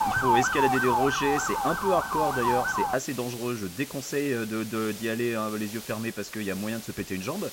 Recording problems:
high frequencies cut off; noticeable; nothing above 8 kHz
hiss; noticeable; throughout; 10 dB below the speech
siren; loud; until 3 s; peak 6 dB above the speech

